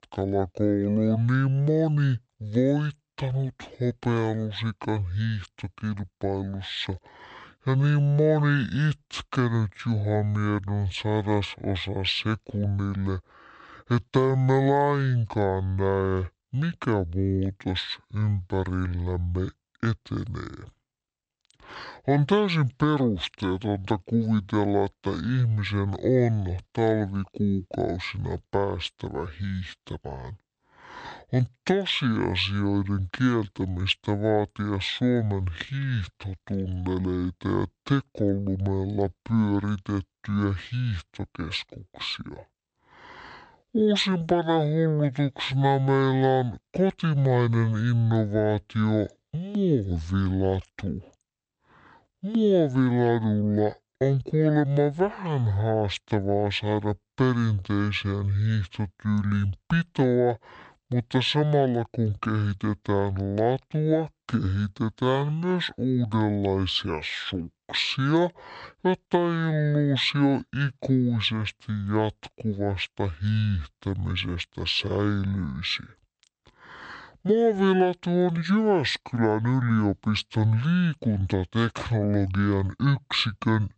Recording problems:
wrong speed and pitch; too slow and too low; 0.6 times normal speed

